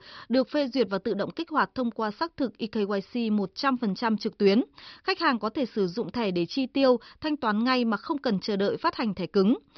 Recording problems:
high frequencies cut off; noticeable; nothing above 5.5 kHz

